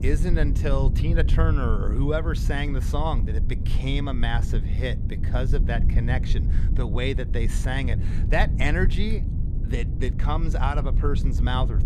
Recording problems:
low rumble; loud; throughout; 10 dB below the speech

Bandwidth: 13.5 kHz